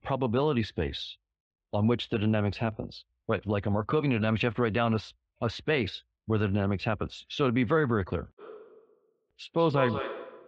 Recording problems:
echo of what is said; strong; from 8.5 s on; 190 ms later, 8 dB below the speech
muffled; very; fading above 3 kHz

